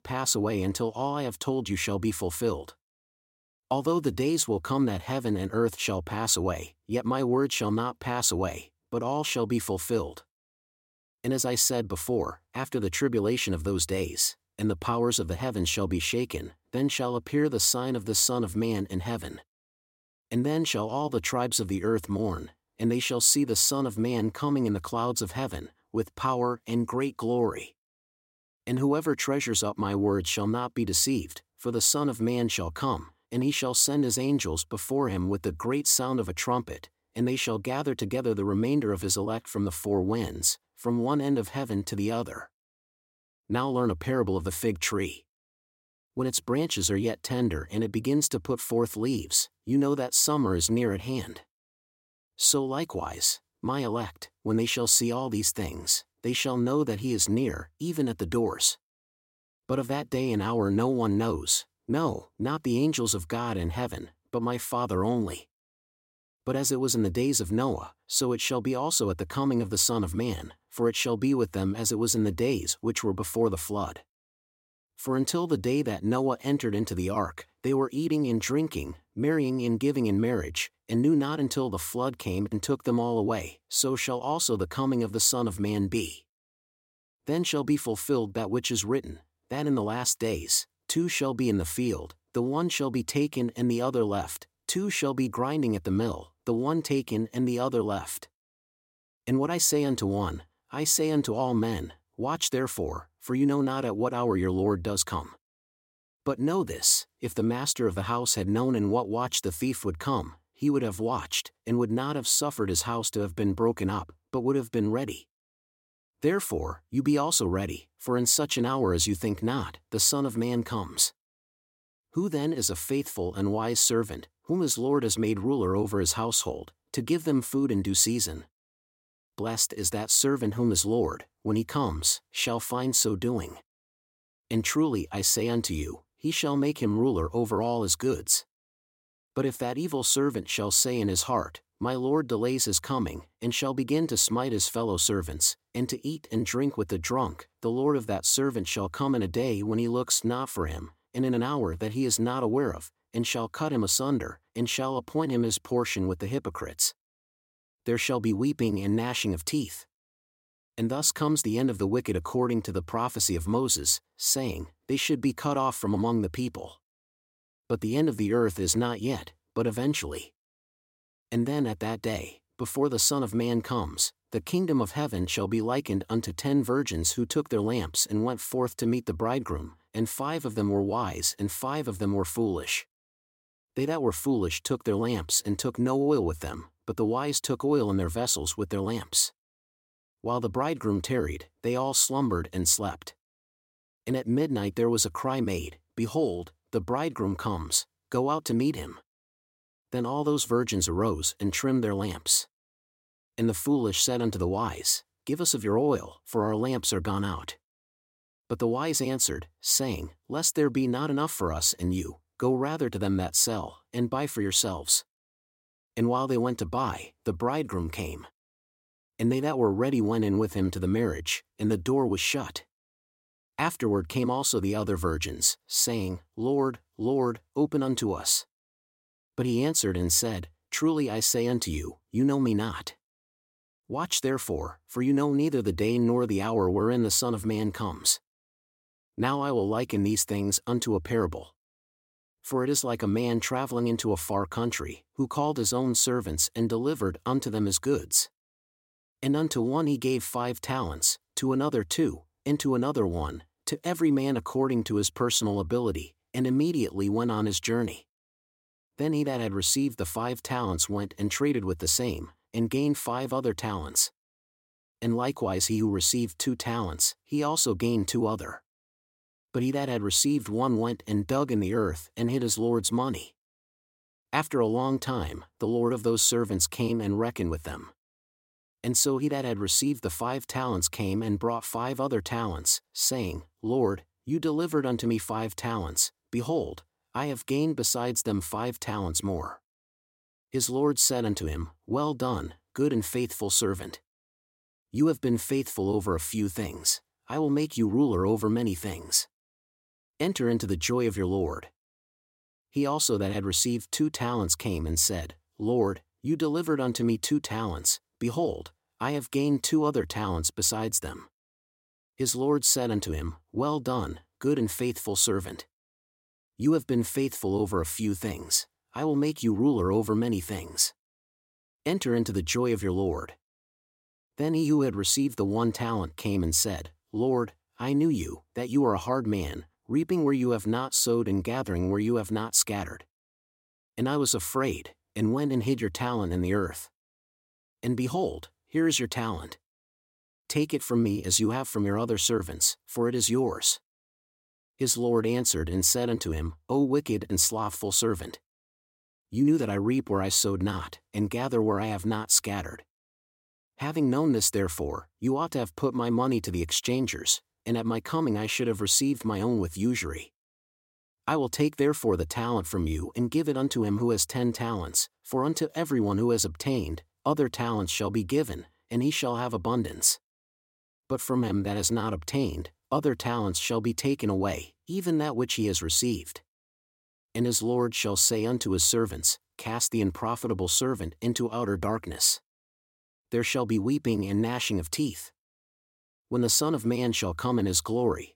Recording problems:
none

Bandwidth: 16.5 kHz